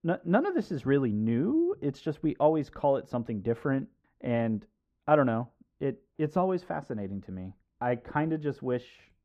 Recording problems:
muffled; very; fading above 2.5 kHz

